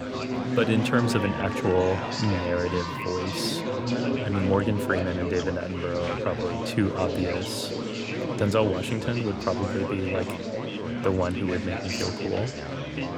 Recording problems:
chatter from many people; loud; throughout; 2 dB below the speech

